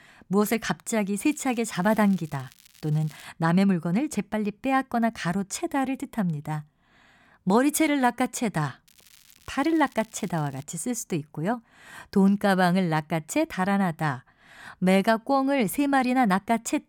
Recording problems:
crackling; faint; from 1.5 to 3.5 s and from 9 to 11 s; 25 dB below the speech

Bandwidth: 17.5 kHz